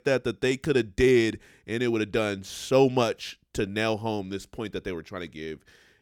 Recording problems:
none

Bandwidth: 18 kHz